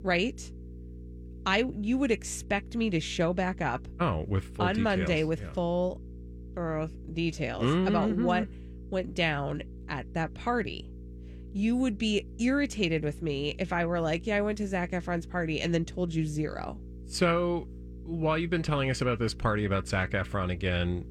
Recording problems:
electrical hum; faint; throughout; 60 Hz, 25 dB below the speech

